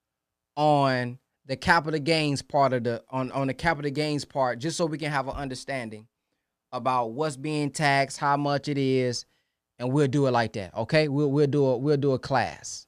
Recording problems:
none

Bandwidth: 14.5 kHz